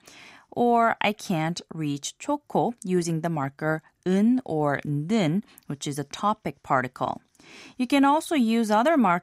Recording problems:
none

